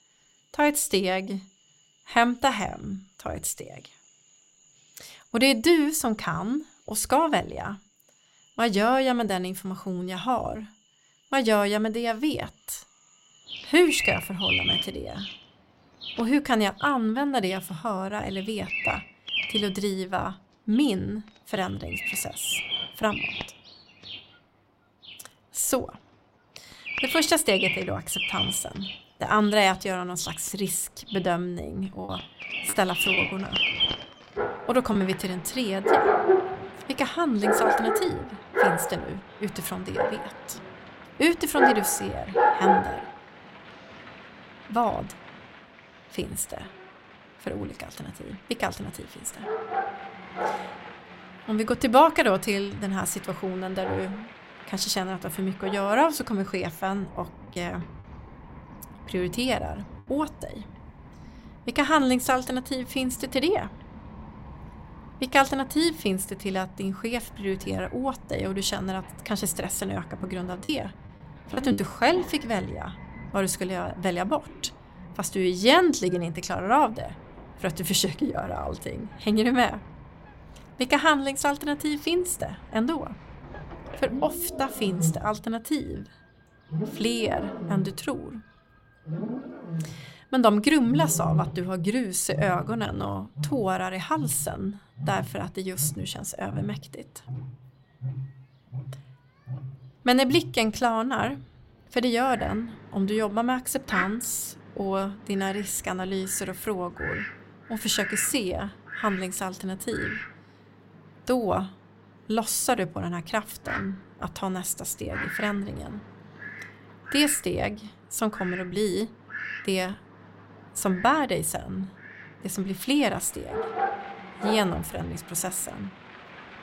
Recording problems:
animal sounds; loud; throughout; 4 dB below the speech
choppy; occasionally; from 32 to 35 s and from 1:11 to 1:12; 4% of the speech affected

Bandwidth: 16 kHz